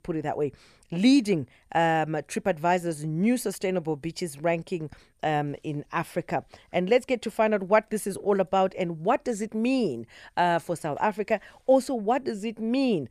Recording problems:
none

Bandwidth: 14.5 kHz